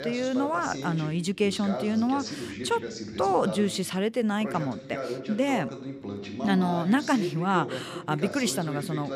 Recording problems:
voice in the background; loud; throughout; 8 dB below the speech

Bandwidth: 15 kHz